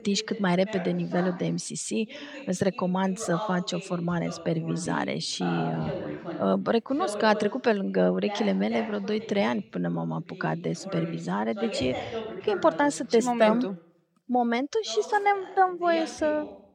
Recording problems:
voice in the background; noticeable; throughout; 10 dB below the speech

